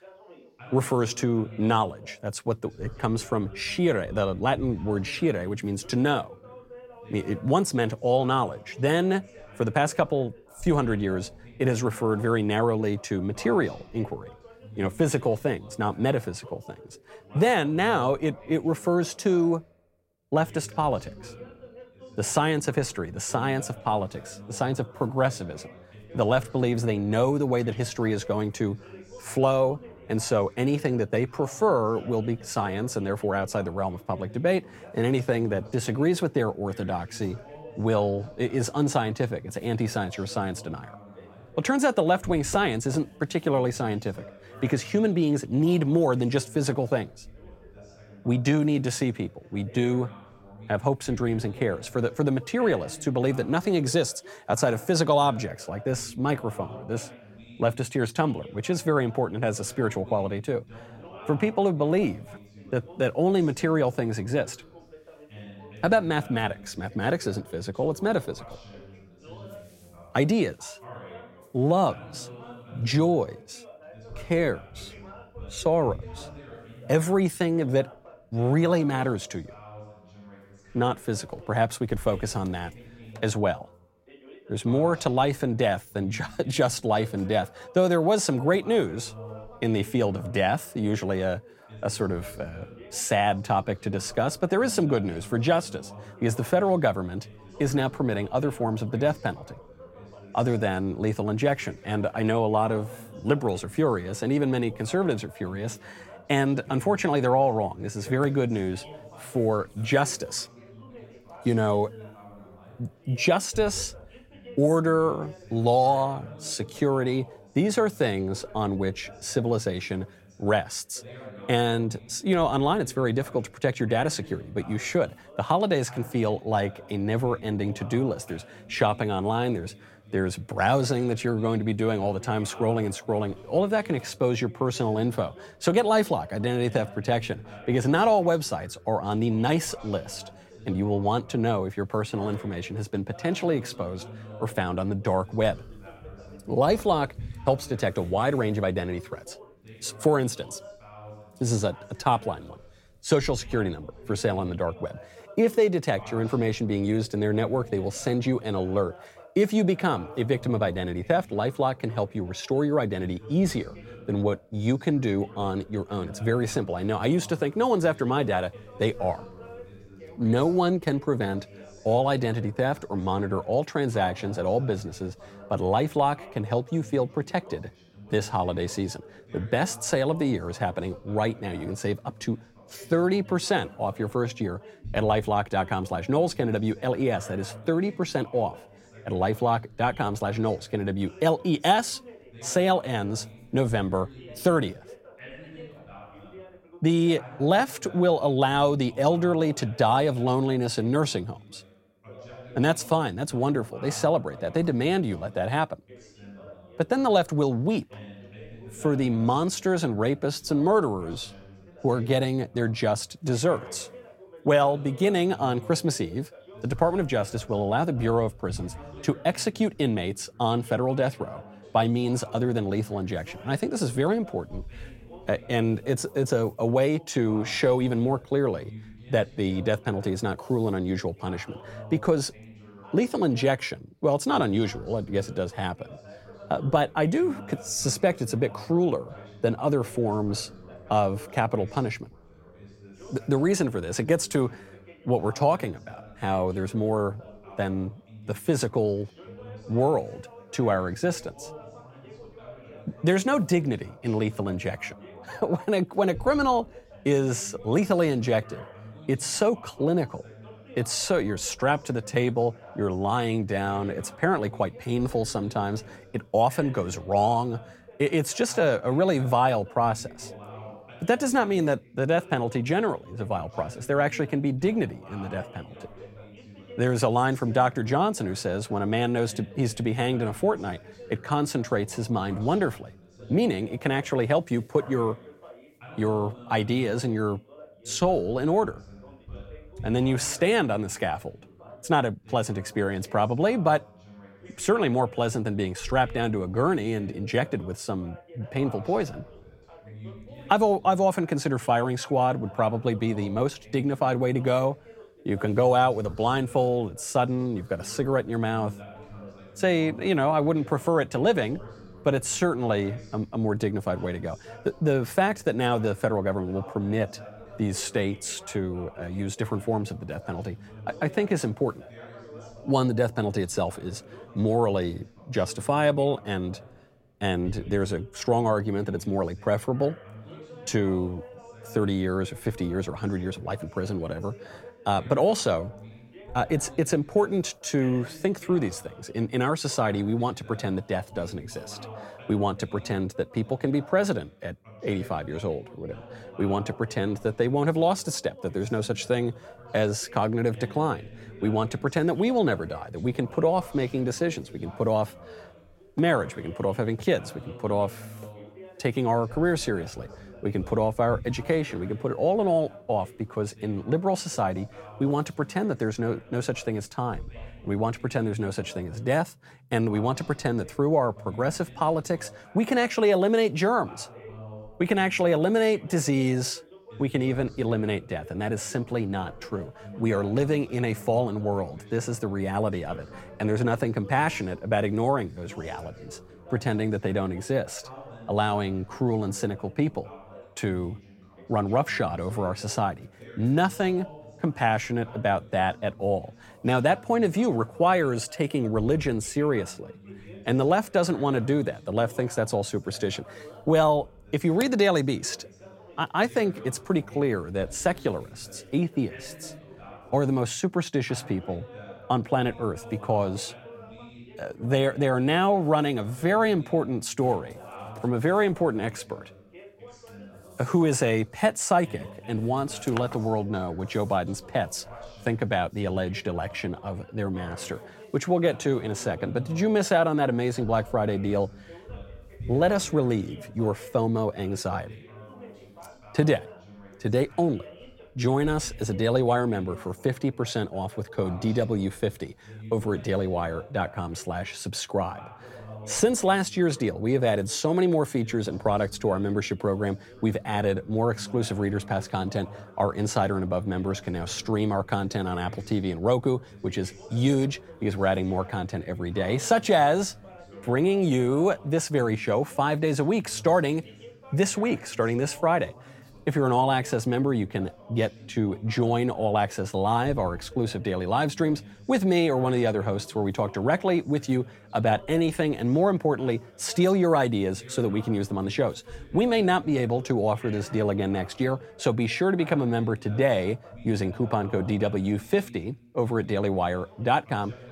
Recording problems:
background chatter; noticeable; throughout; 2 voices, 20 dB below the speech

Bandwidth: 16.5 kHz